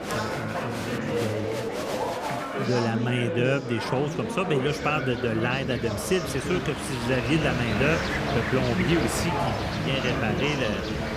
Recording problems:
train or aircraft noise; loud; throughout; 5 dB below the speech
chatter from many people; loud; throughout; 3 dB below the speech

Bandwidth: 15 kHz